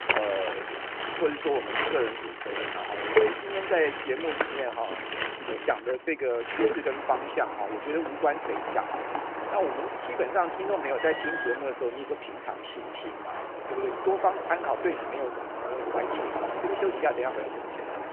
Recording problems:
phone-call audio; nothing above 3 kHz
traffic noise; loud; throughout; 2 dB below the speech
alarm; noticeable; at 11 s; peak 3 dB below the speech

